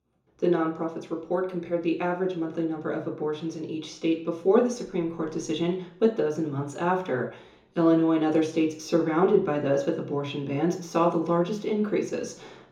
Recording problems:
off-mic speech; far
room echo; slight; dies away in 0.6 s

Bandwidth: 17.5 kHz